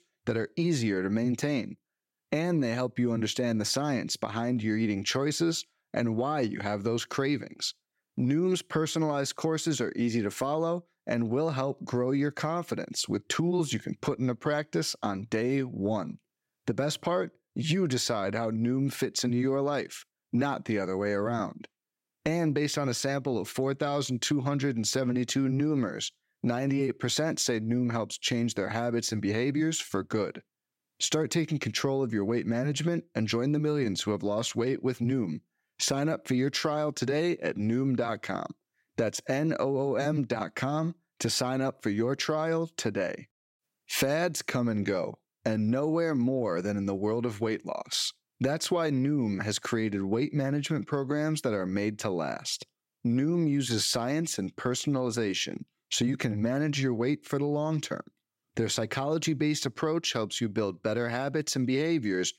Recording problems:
none

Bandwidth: 16 kHz